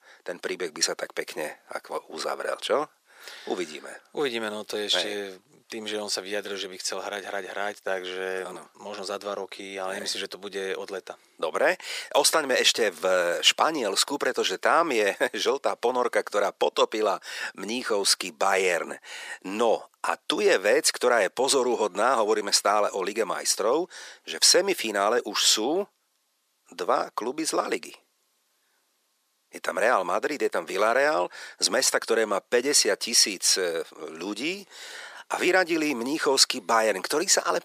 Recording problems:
thin; very; fading below 450 Hz

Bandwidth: 14.5 kHz